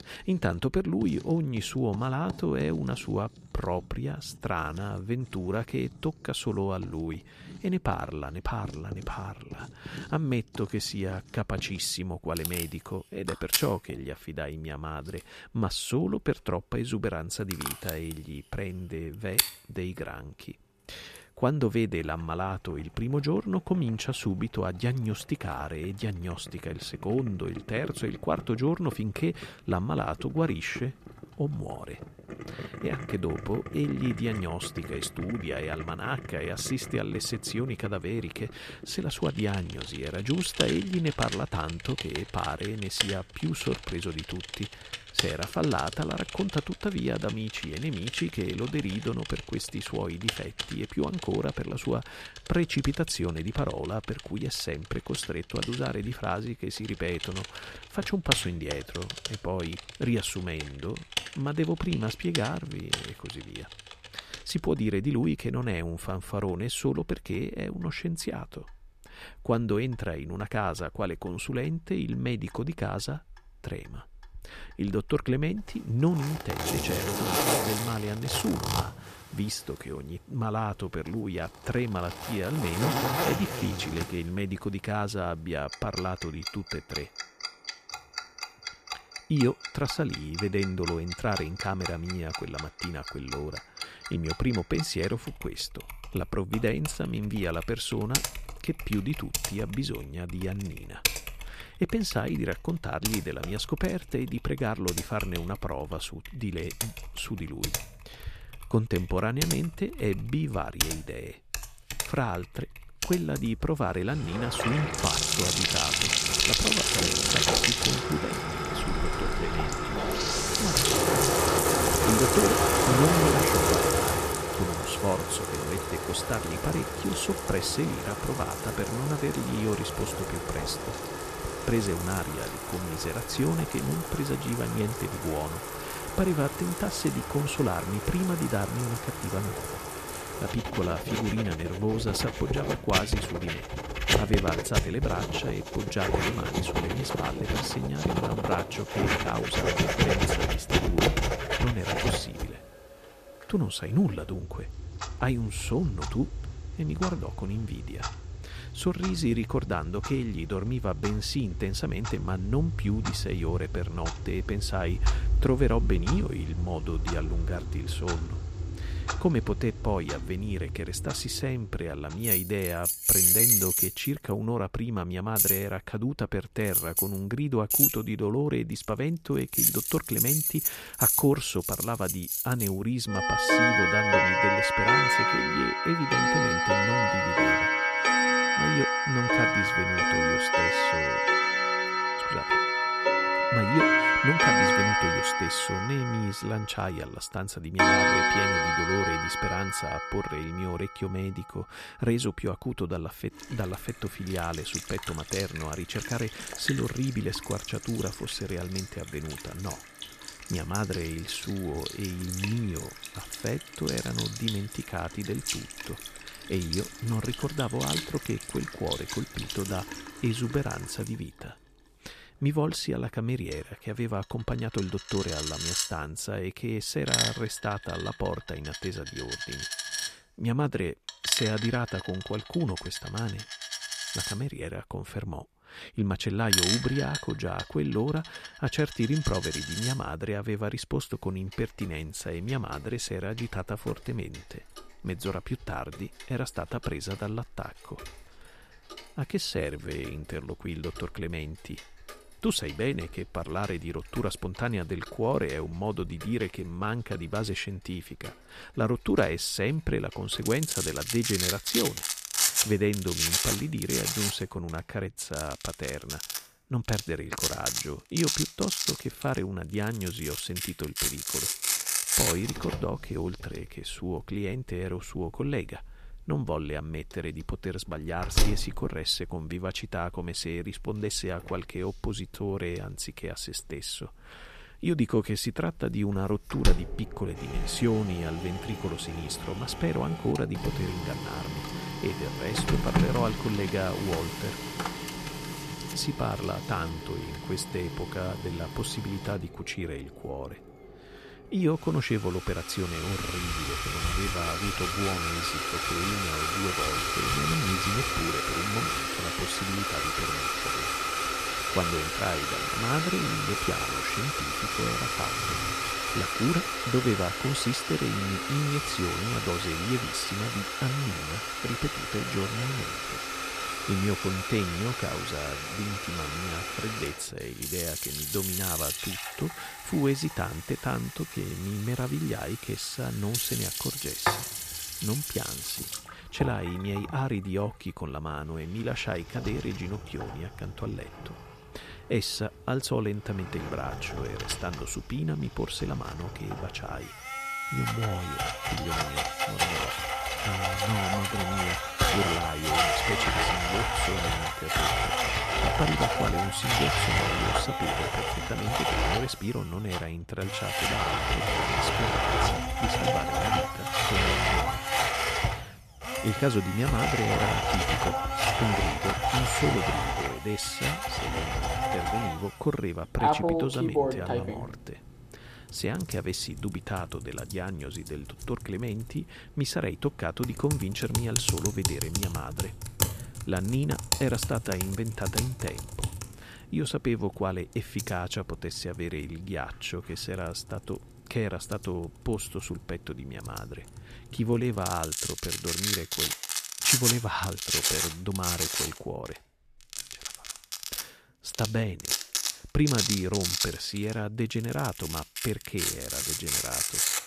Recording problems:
household noises; very loud; throughout; 3 dB above the speech

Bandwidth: 14.5 kHz